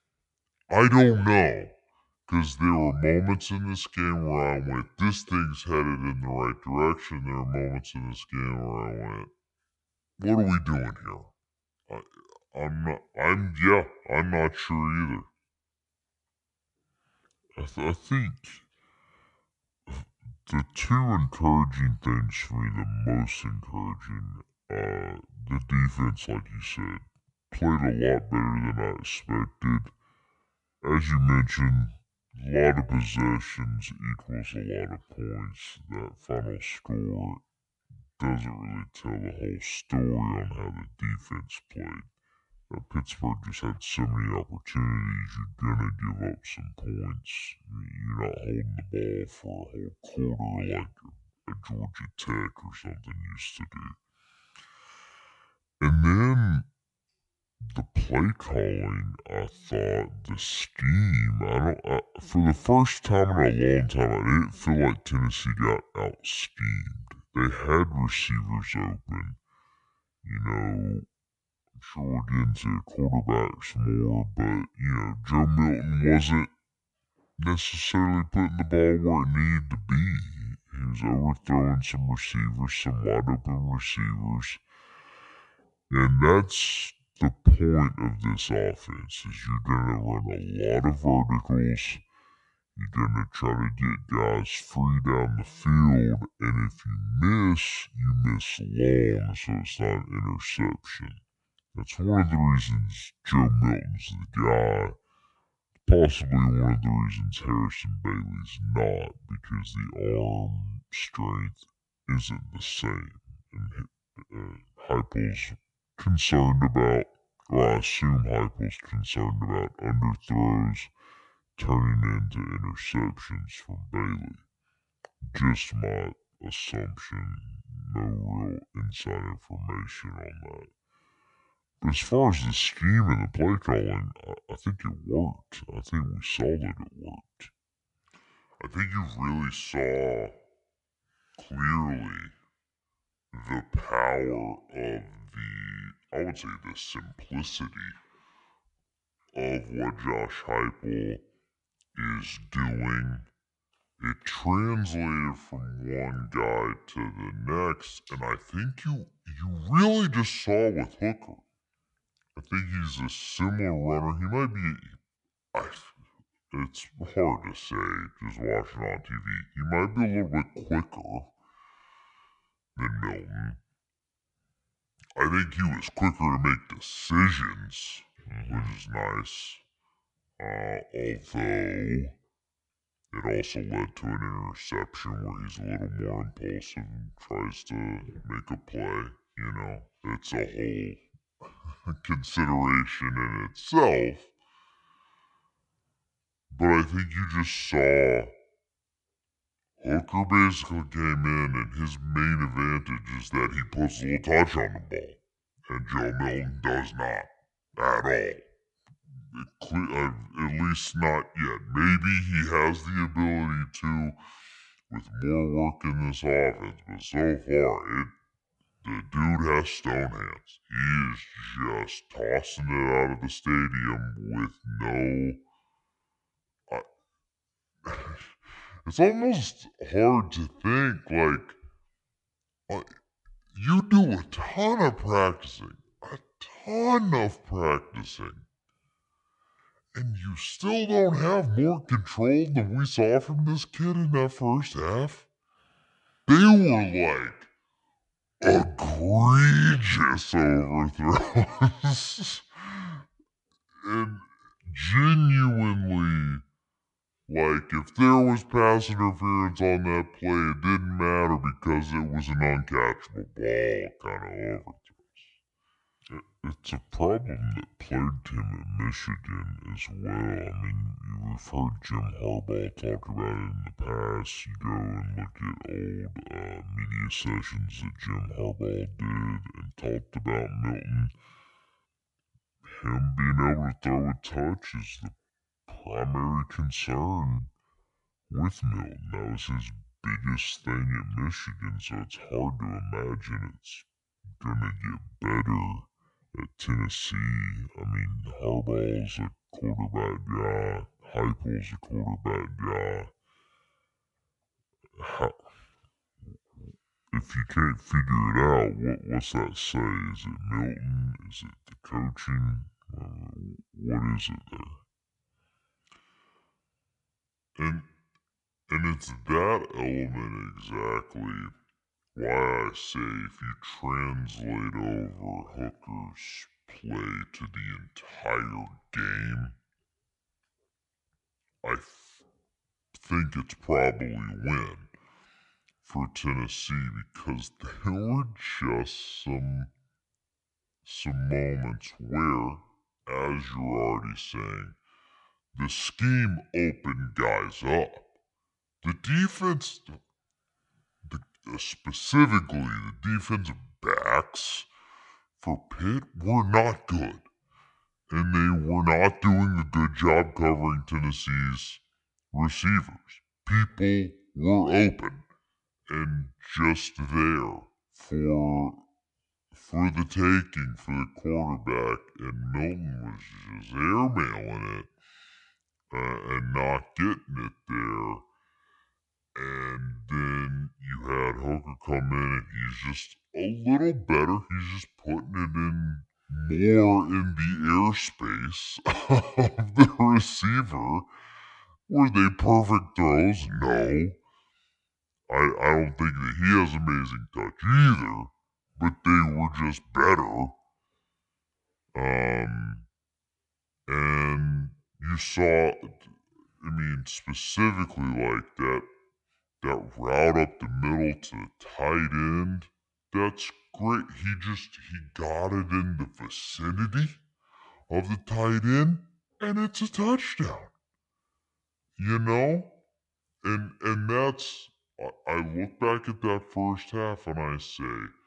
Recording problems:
wrong speed and pitch; too slow and too low; 0.6 times normal speed

